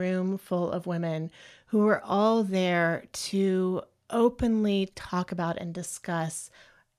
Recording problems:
abrupt cut into speech; at the start

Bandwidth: 14.5 kHz